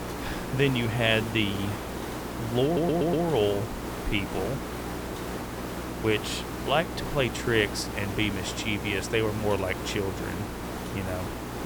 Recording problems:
hiss; loud; throughout; 7 dB below the speech
electrical hum; noticeable; throughout; 60 Hz, 20 dB below the speech
audio stuttering; at 2.5 s

